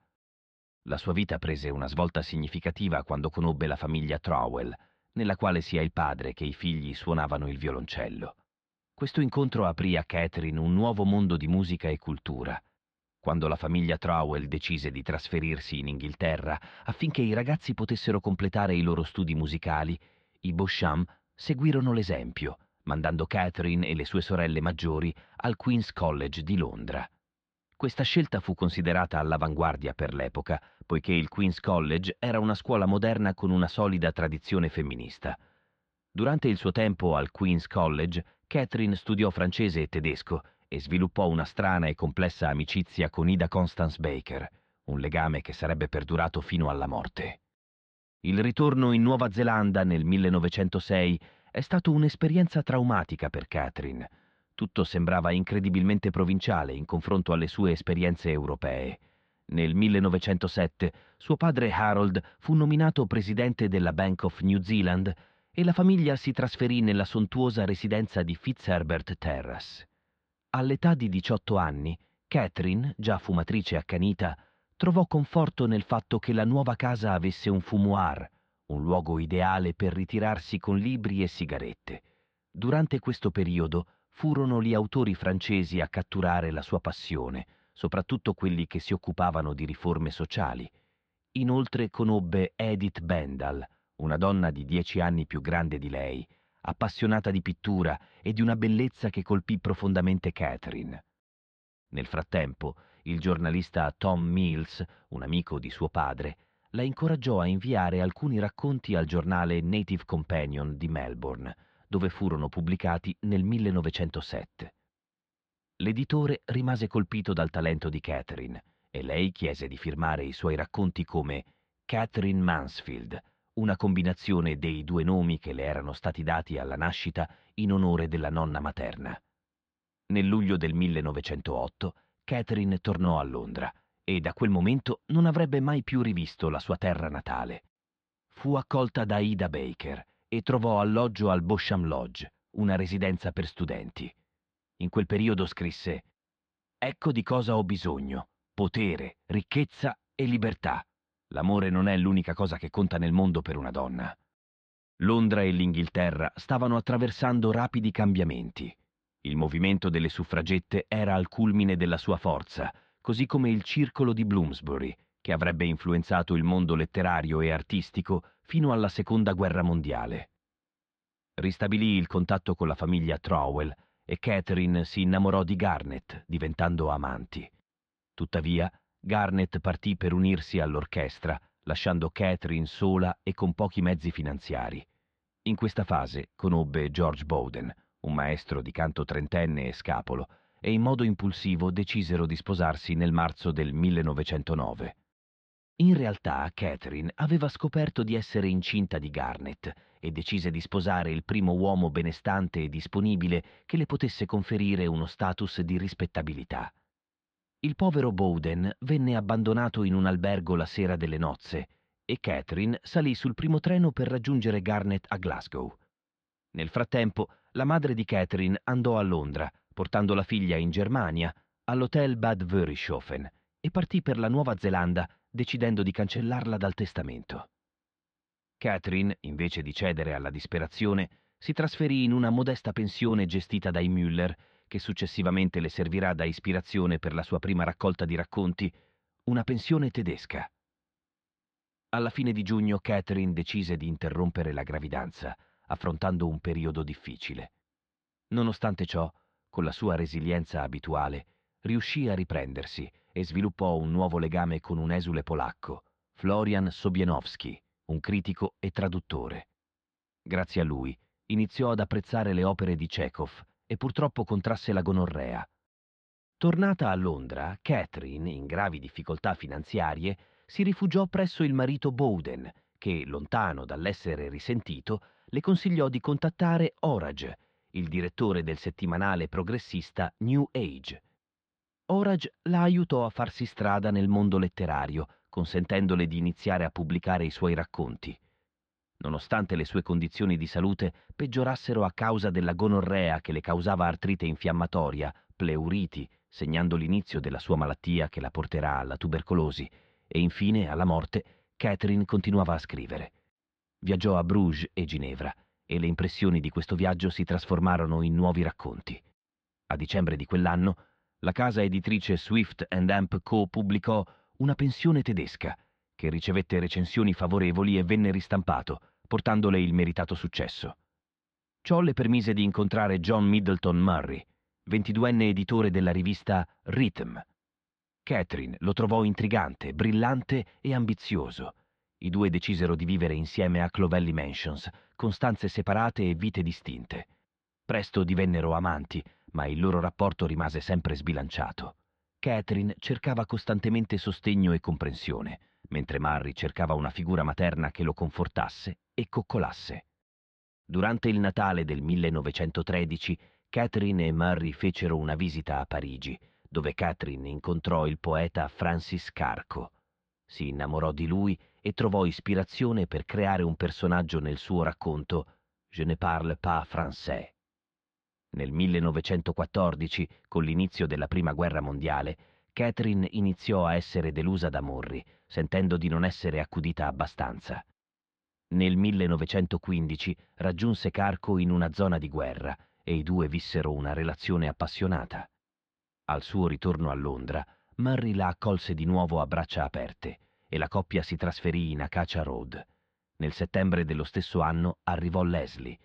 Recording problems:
muffled; slightly; fading above 4 kHz

